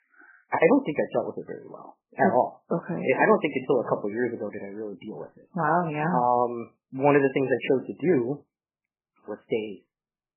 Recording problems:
garbled, watery; badly; nothing above 3 kHz

